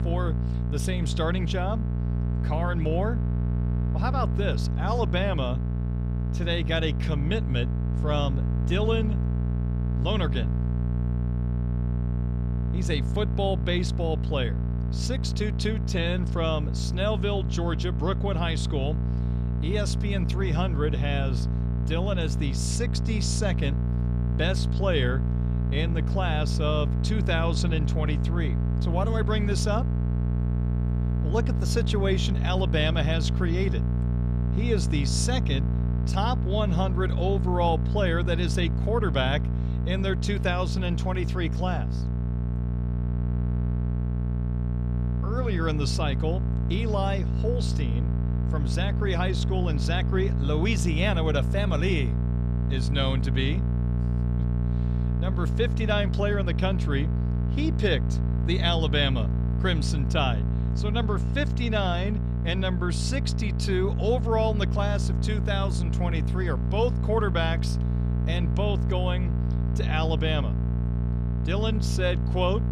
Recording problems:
electrical hum; loud; throughout; 60 Hz, 8 dB below the speech

